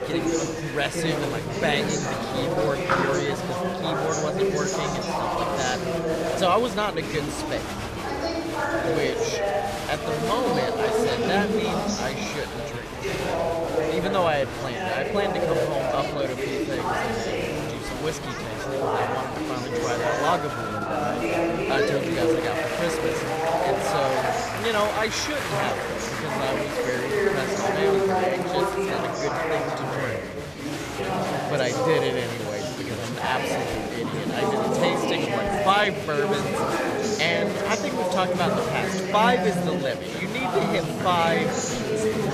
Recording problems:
chatter from many people; very loud; throughout; 2 dB above the speech

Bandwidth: 14.5 kHz